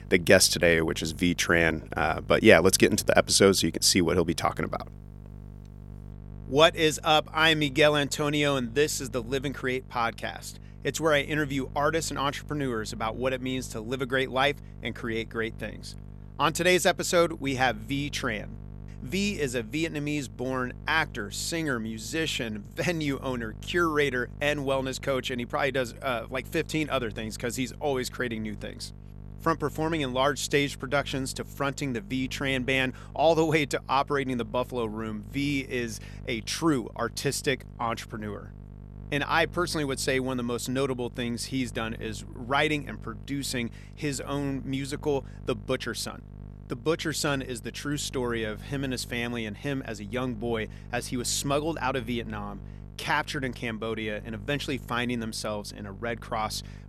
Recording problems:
electrical hum; faint; throughout; 50 Hz, 25 dB below the speech

